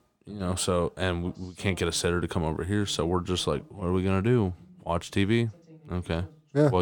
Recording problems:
voice in the background; faint; throughout; 25 dB below the speech
abrupt cut into speech; at the end

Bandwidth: 17.5 kHz